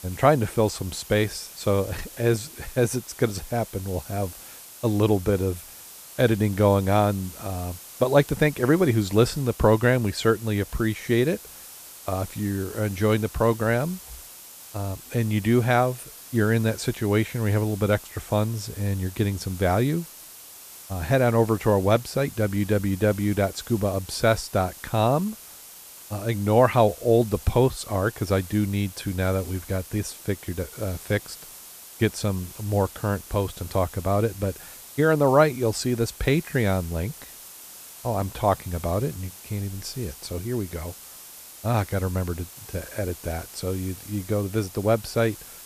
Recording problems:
hiss; noticeable; throughout; 15 dB below the speech

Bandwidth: 14.5 kHz